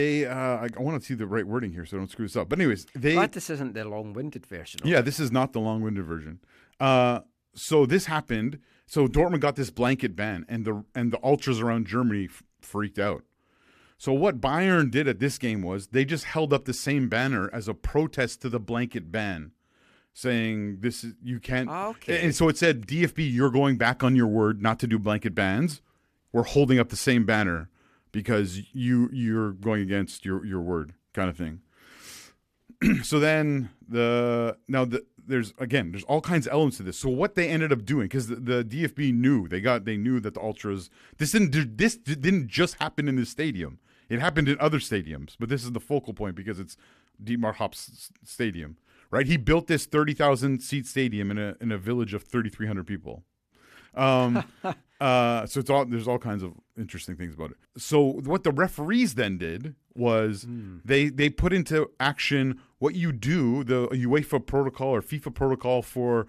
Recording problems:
abrupt cut into speech; at the start

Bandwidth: 14.5 kHz